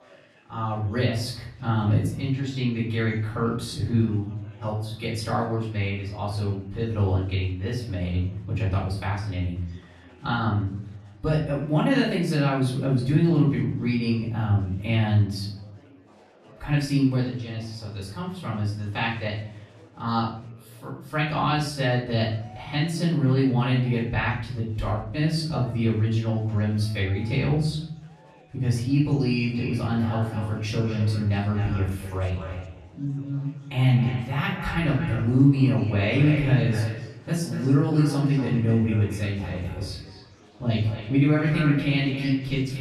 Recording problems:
echo of what is said; strong; from 29 s on; 230 ms later, 10 dB below the speech
off-mic speech; far
room echo; noticeable; dies away in 0.7 s
chatter from many people; faint; throughout; 30 dB below the speech

